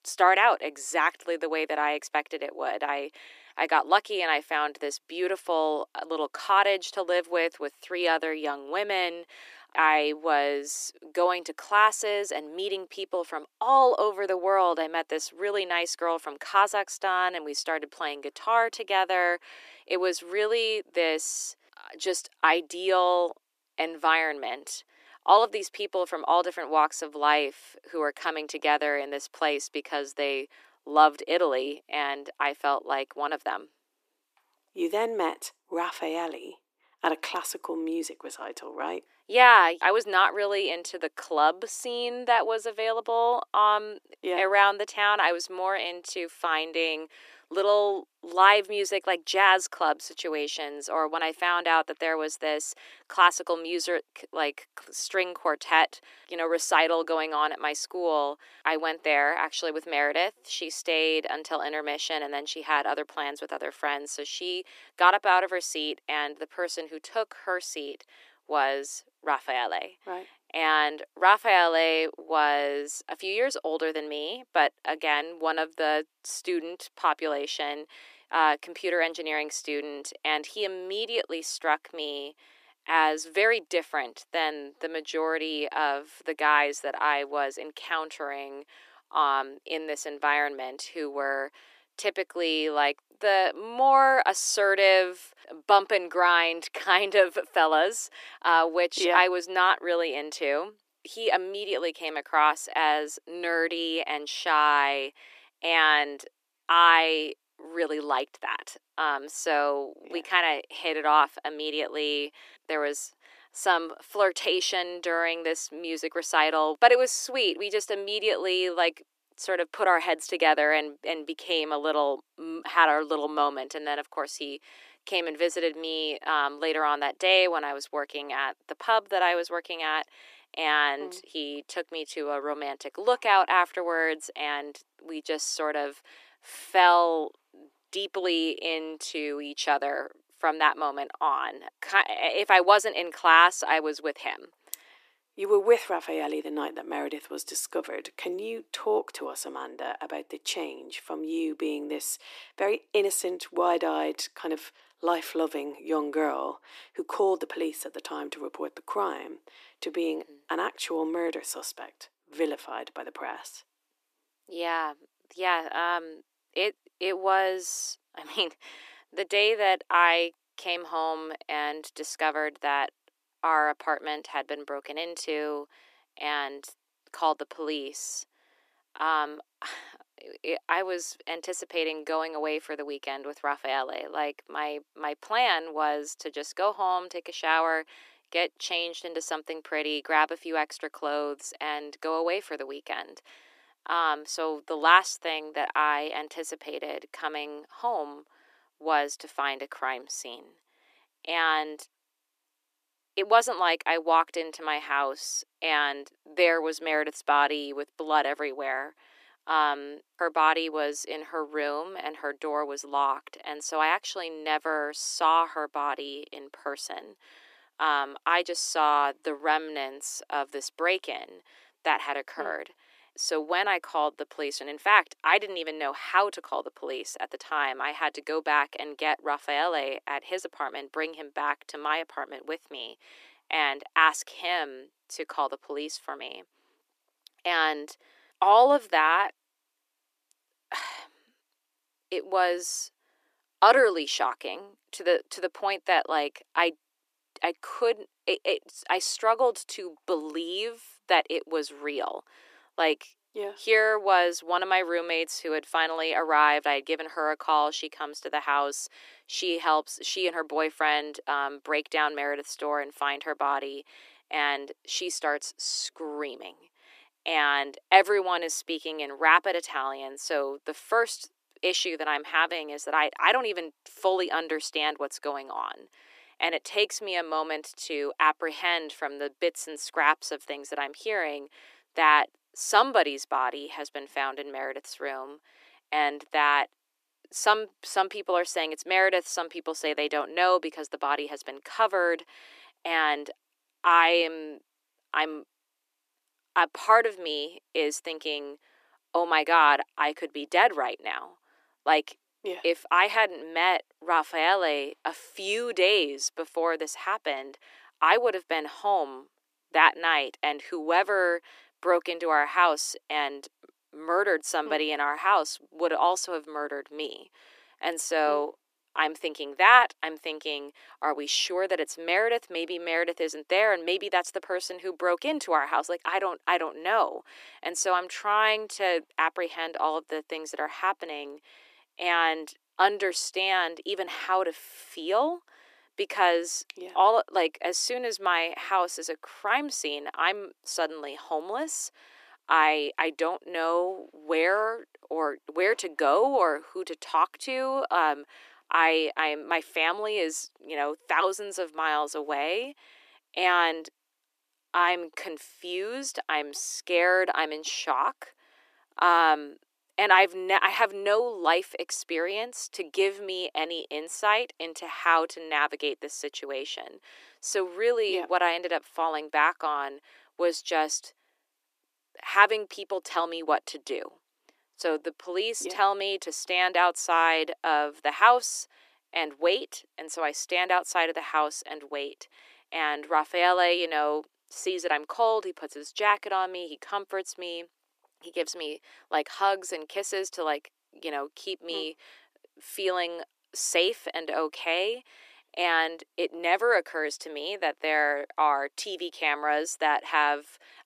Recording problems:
thin; very; fading below 300 Hz

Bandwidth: 14.5 kHz